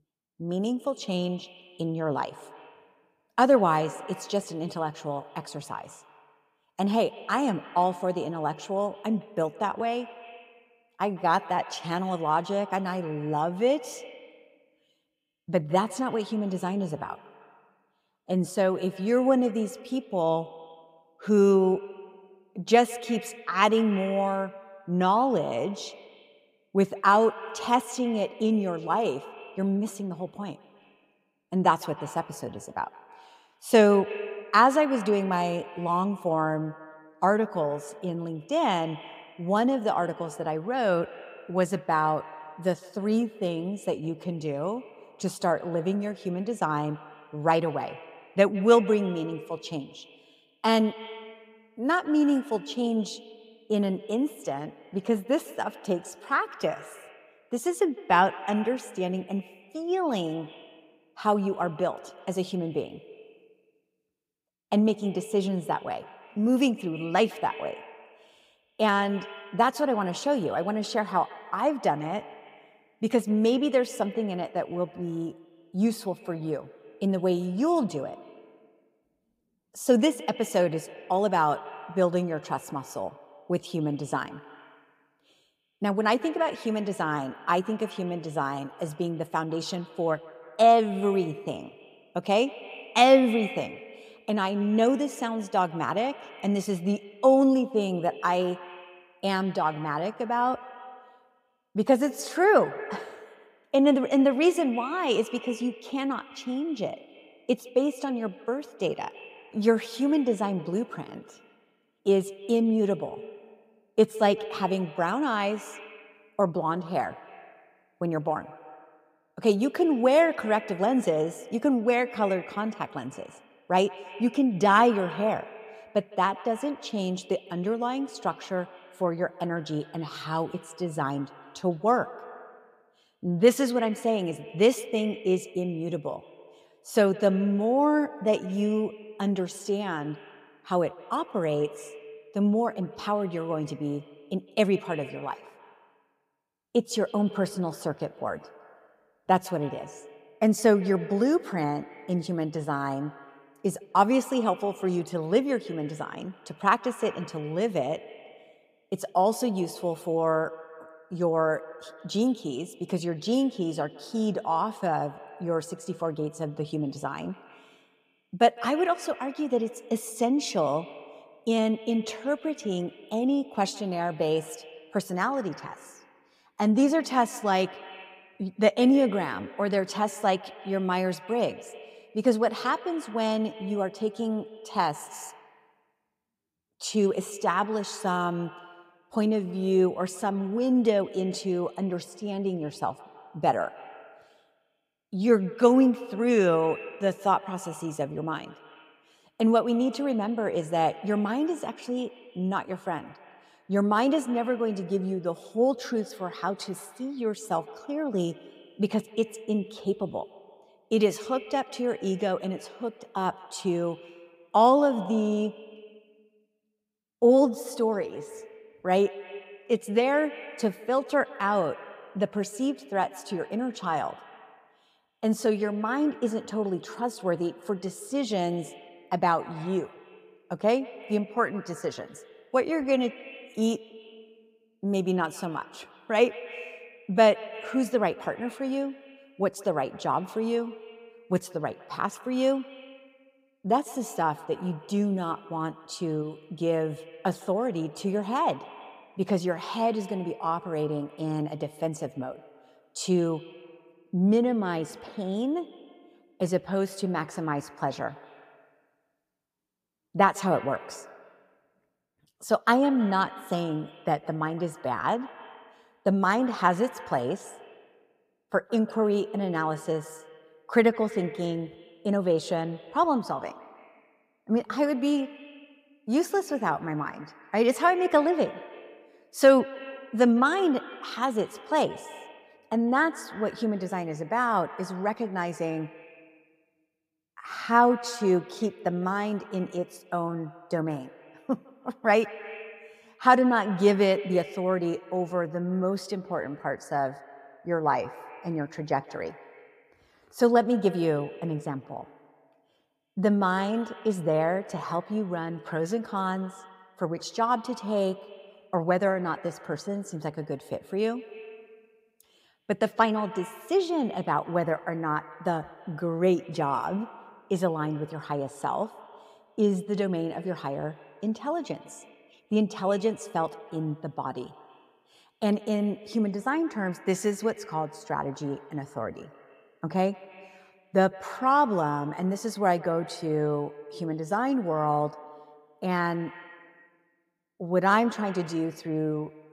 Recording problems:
echo of what is said; noticeable; throughout; 160 ms later, 20 dB below the speech

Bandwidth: 15.5 kHz